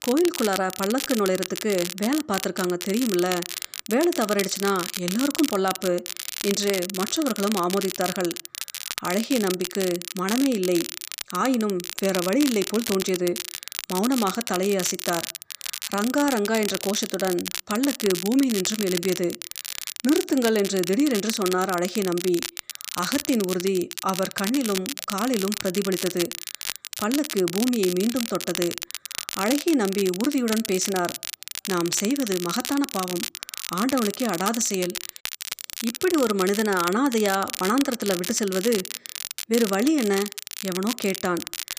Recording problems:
crackle, like an old record; loud; 6 dB below the speech

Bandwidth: 15 kHz